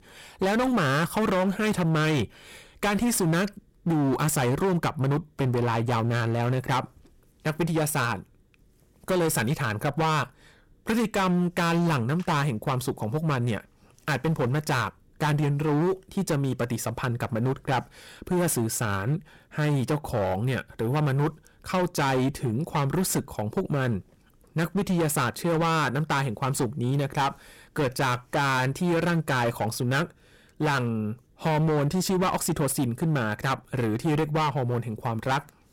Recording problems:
distortion; heavy; 18% of the sound clipped

